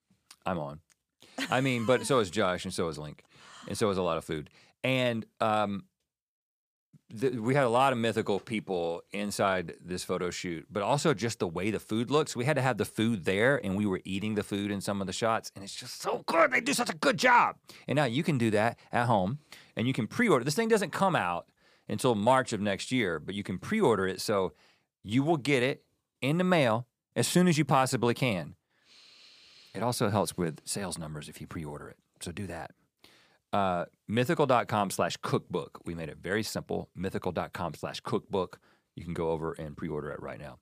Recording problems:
none

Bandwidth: 15 kHz